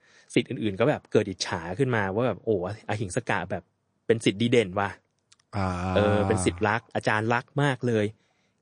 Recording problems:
garbled, watery; slightly; nothing above 9 kHz

